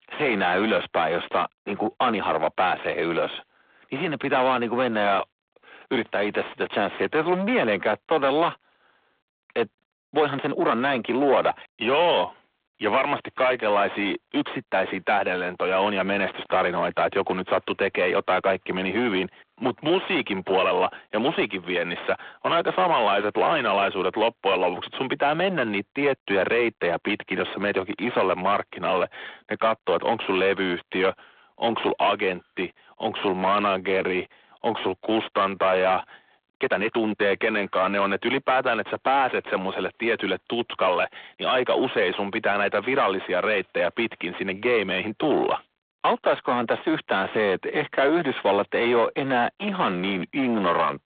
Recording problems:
distortion; heavy; 6 dB below the speech
phone-call audio
uneven, jittery; strongly; from 2 to 47 s

